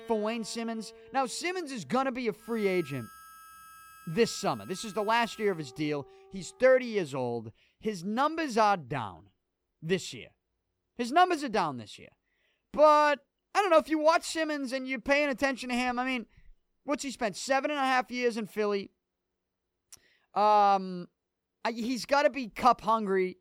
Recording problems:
background music; very faint; until 6.5 s; 25 dB below the speech

